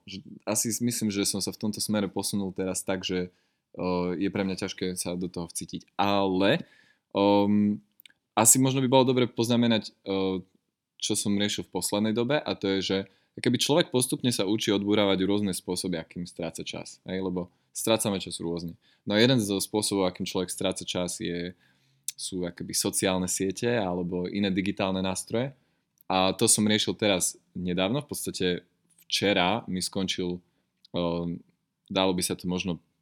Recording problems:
none

